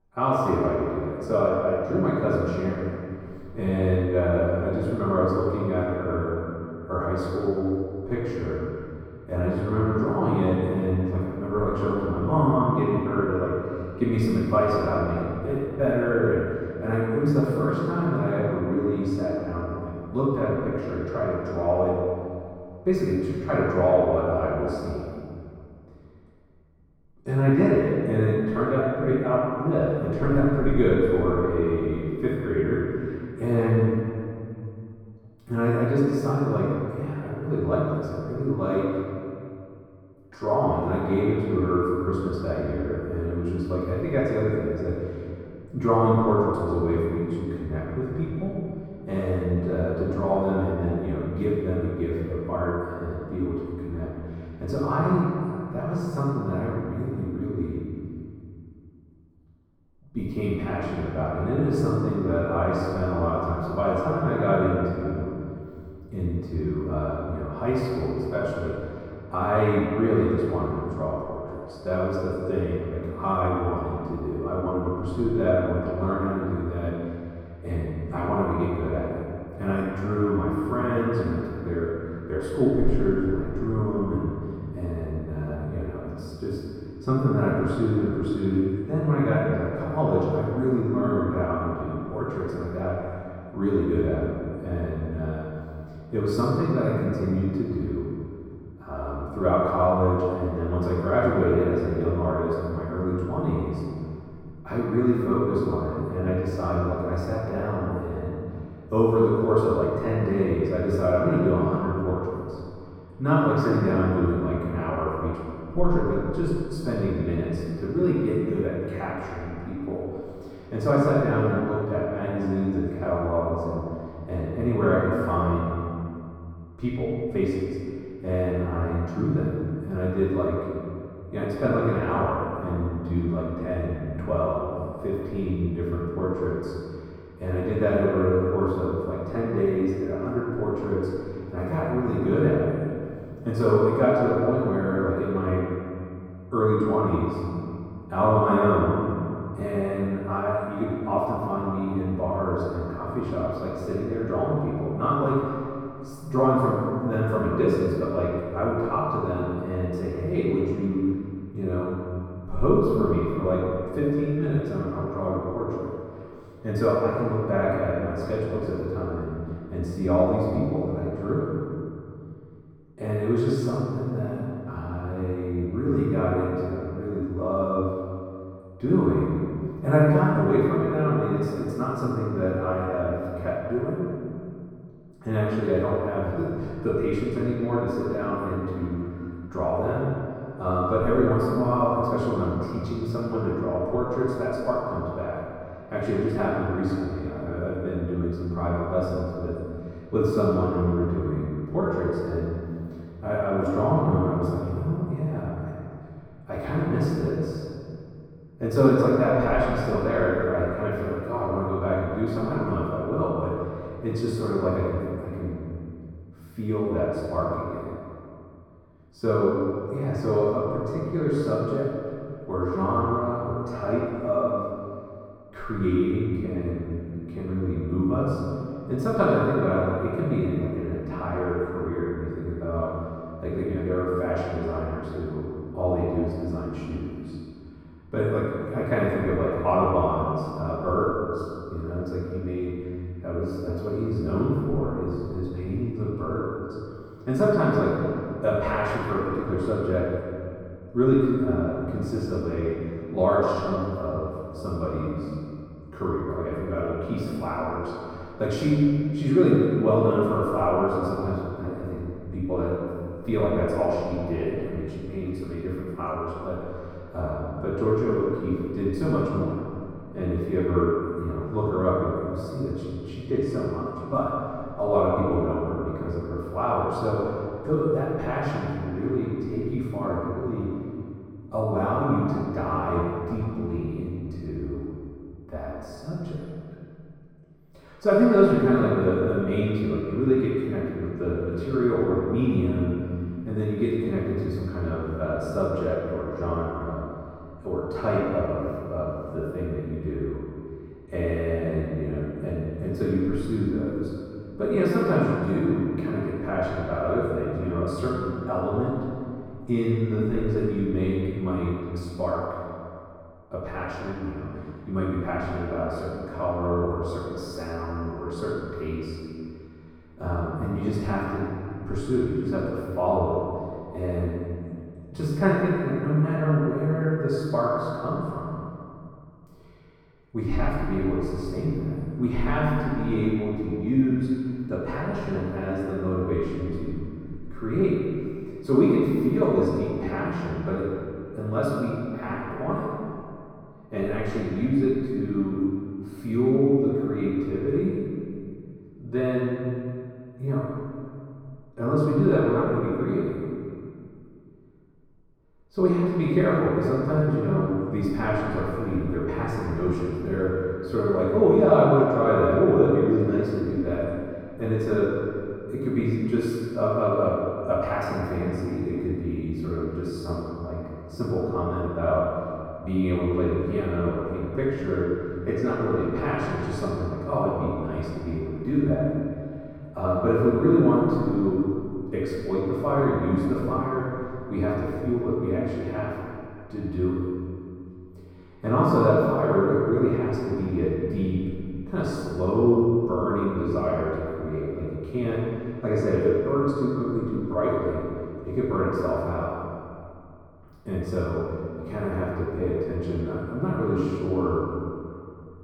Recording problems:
room echo; strong; dies away in 2.2 s
off-mic speech; far
muffled; very; fading above 1.5 kHz

